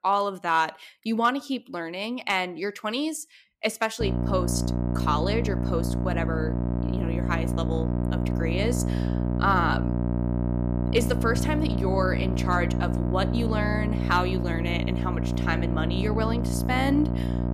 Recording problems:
electrical hum; loud; from 4 s on; 60 Hz, 7 dB below the speech

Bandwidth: 14.5 kHz